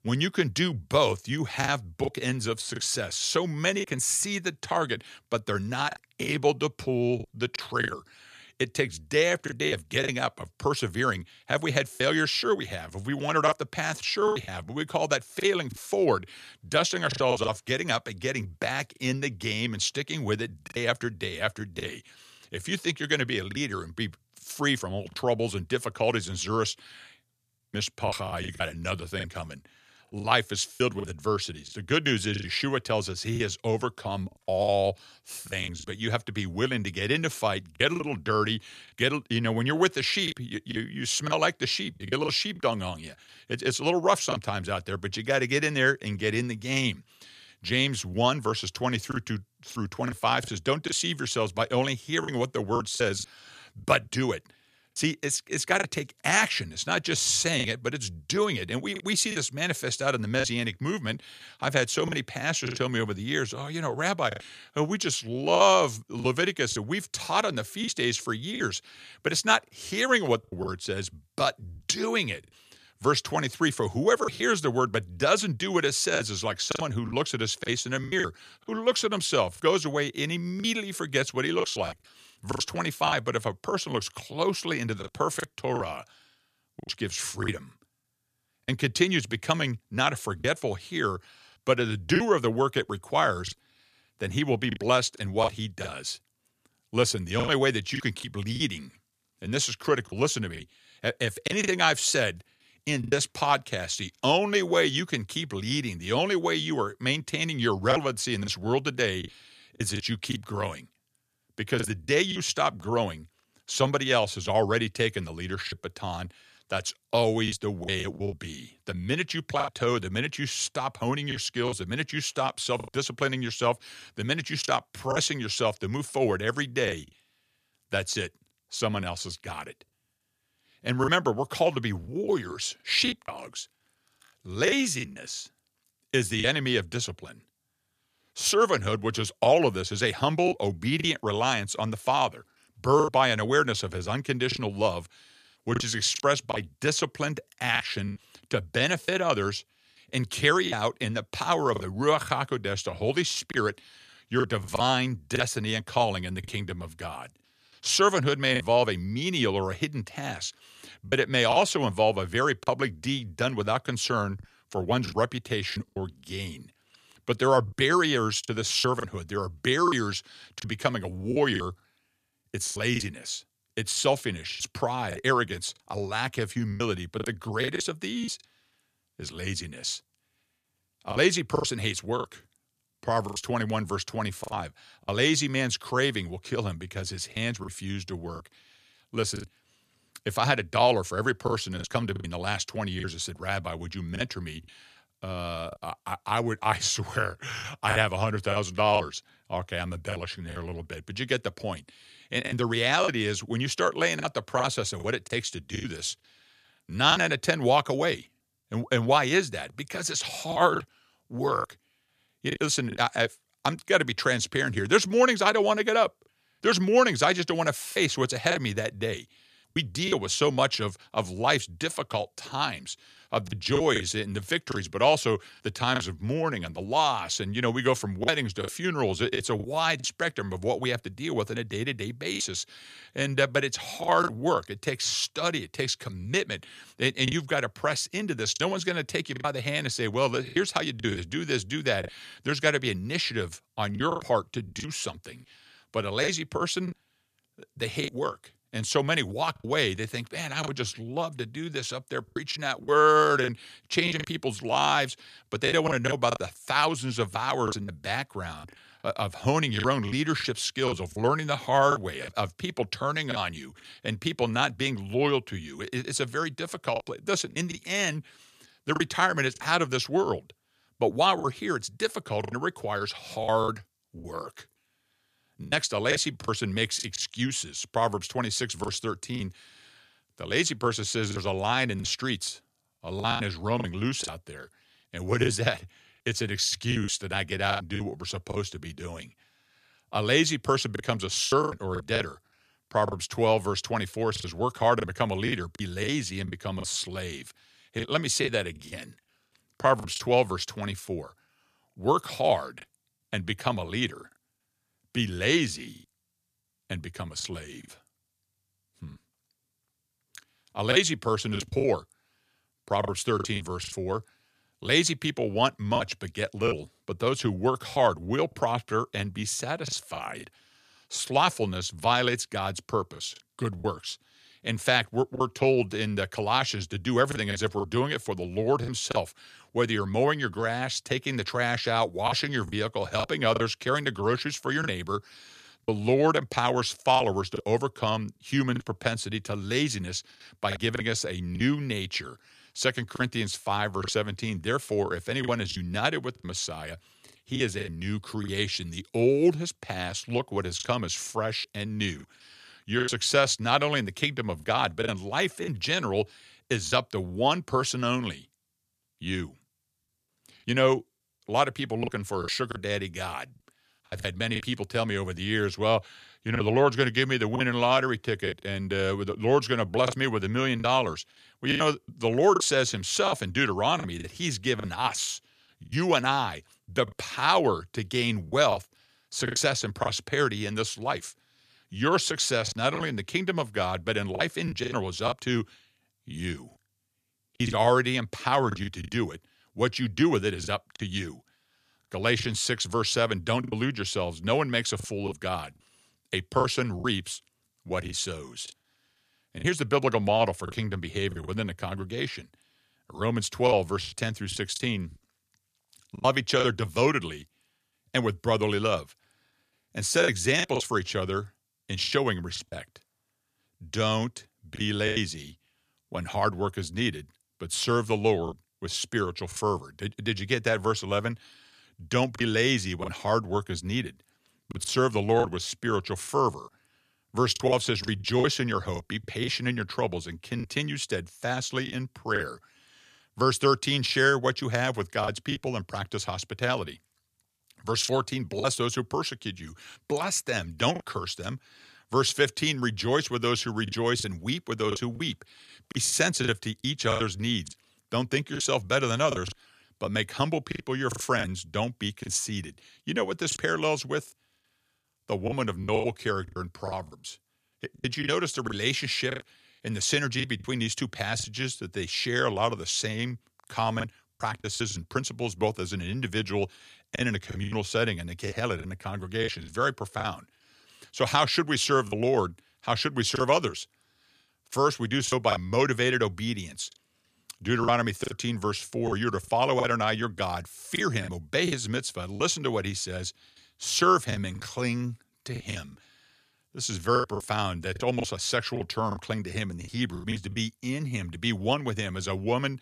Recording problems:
choppy; very; 6% of the speech affected

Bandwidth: 14.5 kHz